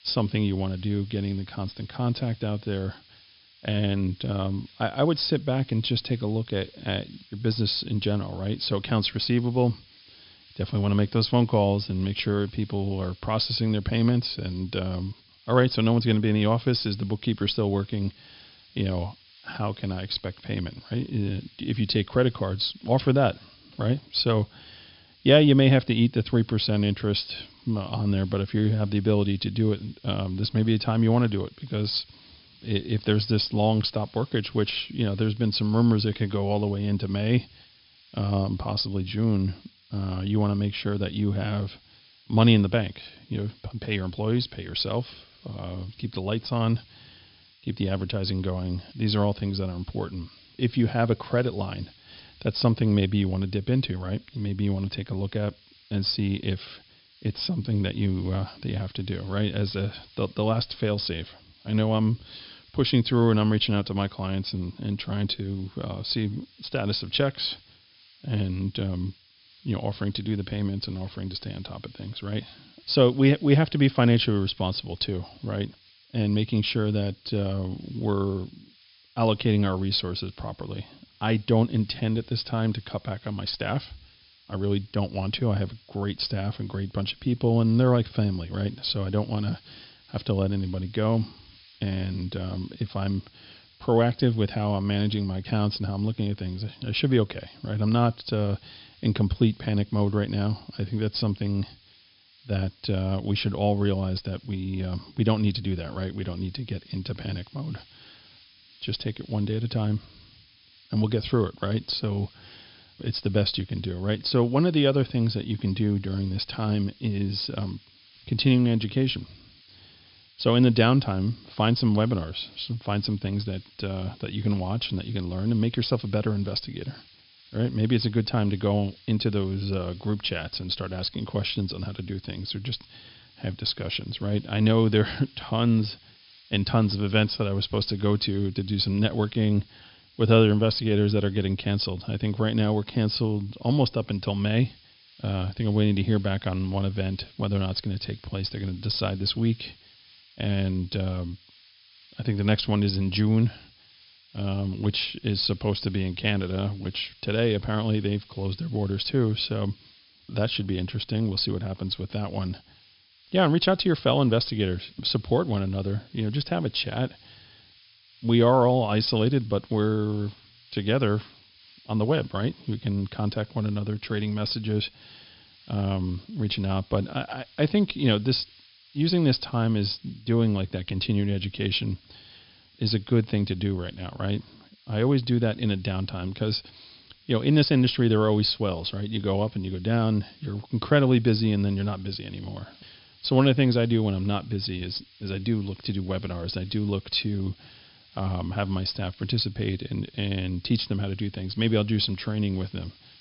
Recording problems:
high frequencies cut off; noticeable; nothing above 5.5 kHz
hiss; faint; throughout; 25 dB below the speech

